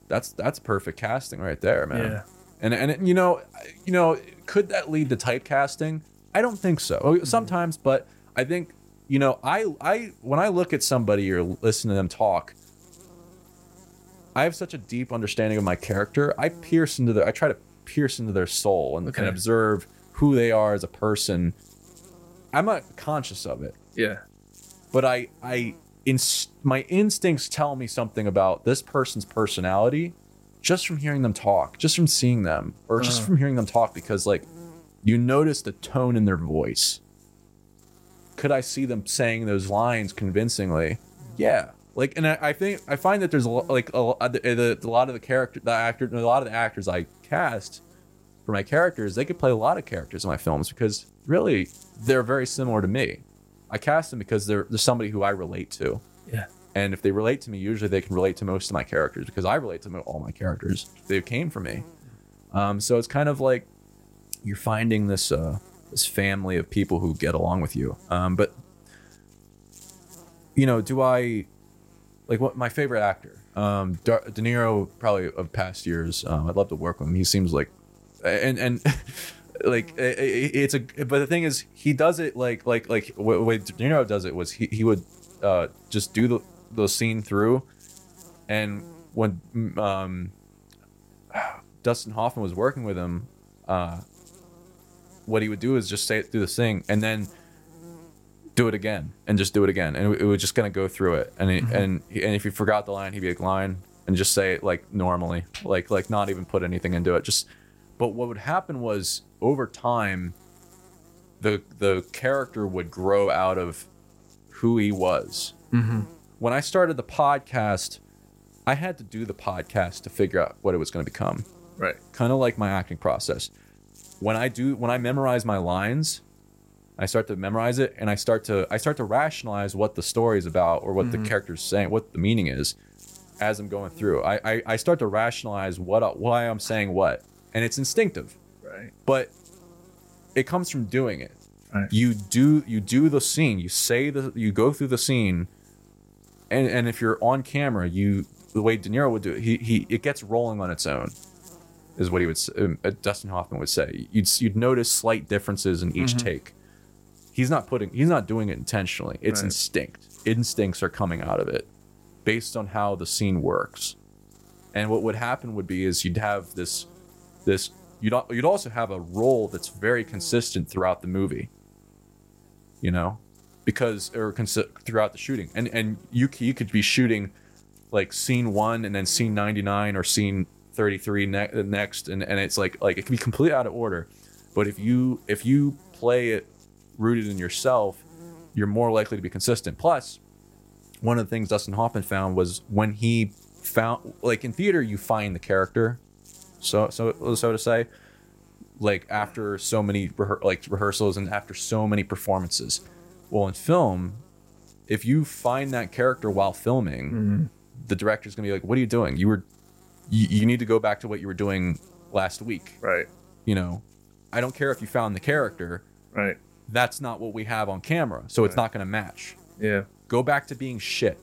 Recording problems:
electrical hum; faint; throughout; 50 Hz, 30 dB below the speech

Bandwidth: 16 kHz